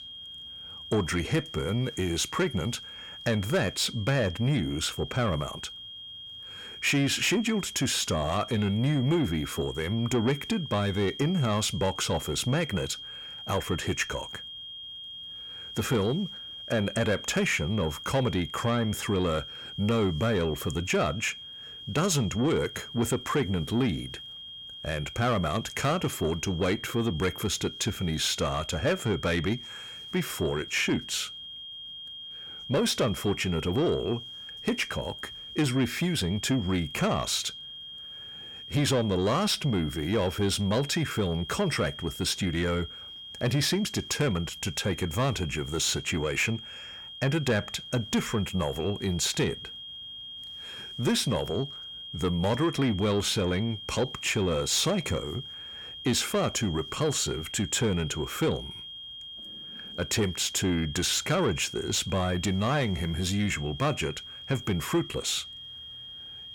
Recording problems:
distortion; slight; 10 dB below the speech
high-pitched whine; noticeable; throughout; 3 kHz, 10 dB below the speech

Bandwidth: 17.5 kHz